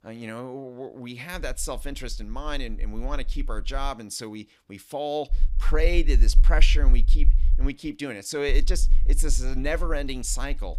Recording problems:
low rumble; faint; from 1.5 to 4 s, from 5.5 to 7.5 s and from 8.5 s on; 20 dB below the speech

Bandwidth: 15.5 kHz